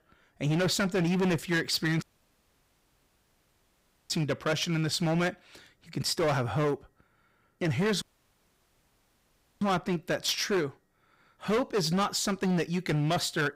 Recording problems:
distortion; heavy; 15% of the sound clipped
audio cutting out; at 2 s for 2 s and at 8 s for 1.5 s

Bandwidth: 15.5 kHz